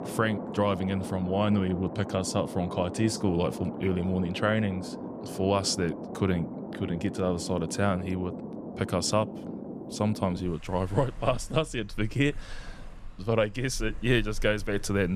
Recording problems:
rain or running water; noticeable; throughout; 10 dB below the speech
abrupt cut into speech; at the end

